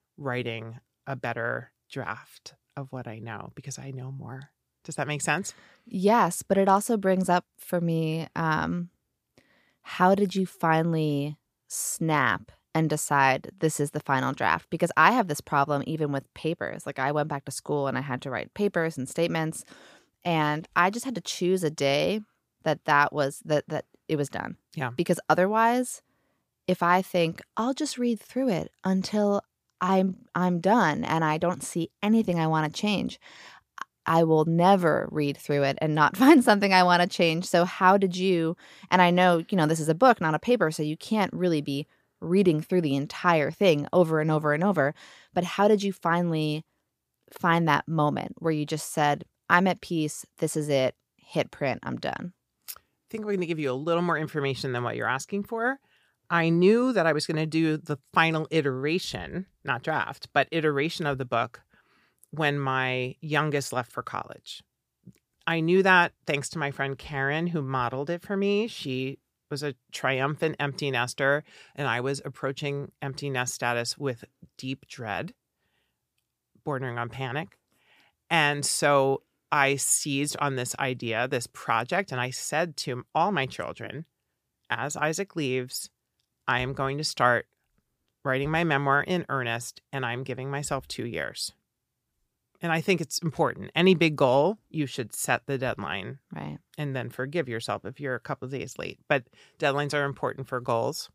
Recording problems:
none

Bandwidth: 15 kHz